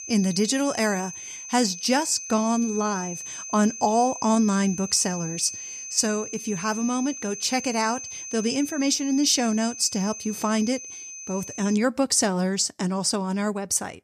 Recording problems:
high-pitched whine; noticeable; until 12 s; 6 kHz, 10 dB below the speech

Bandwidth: 14.5 kHz